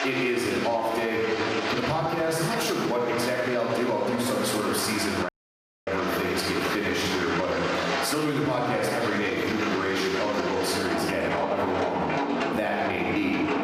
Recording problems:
off-mic speech; far
room echo; noticeable; dies away in 1.3 s
squashed, flat; somewhat
rain or running water; loud; throughout; 4 dB below the speech
audio cutting out; at 5.5 s for 0.5 s

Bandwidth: 14.5 kHz